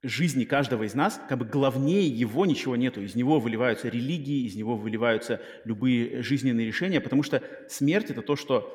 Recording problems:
echo of what is said; noticeable; throughout; 90 ms later, 15 dB below the speech

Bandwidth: 17 kHz